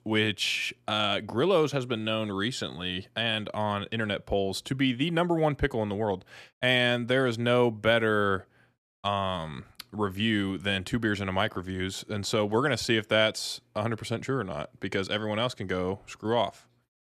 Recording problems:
none

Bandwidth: 14.5 kHz